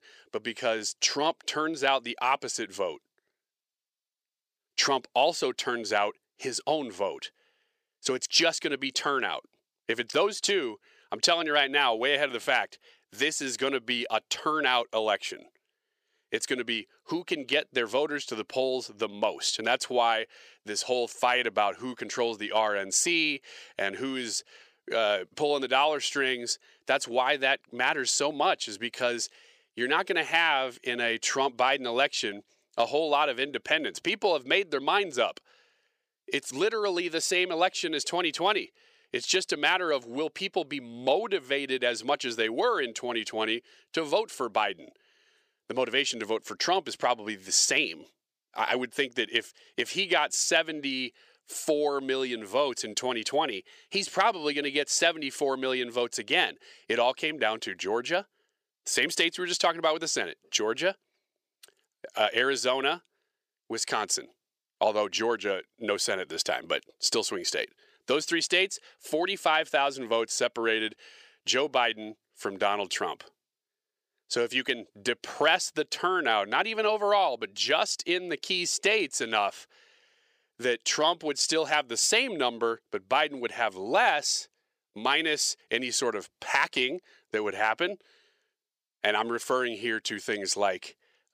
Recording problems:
thin; somewhat; fading below 500 Hz

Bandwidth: 15 kHz